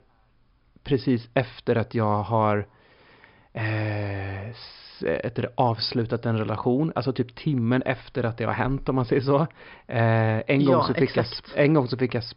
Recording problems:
high frequencies cut off; noticeable; nothing above 5.5 kHz

